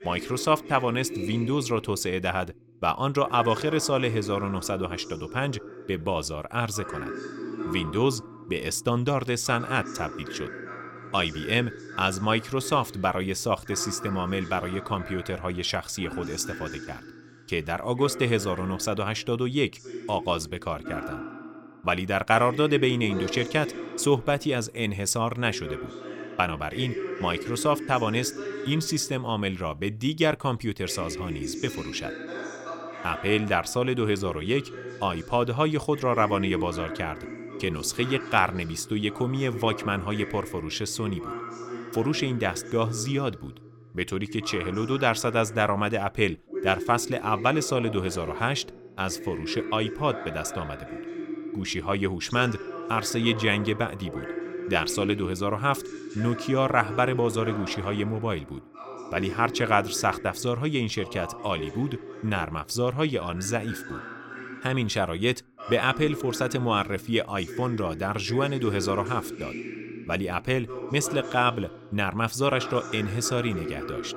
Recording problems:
voice in the background; noticeable; throughout; 10 dB below the speech

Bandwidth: 17.5 kHz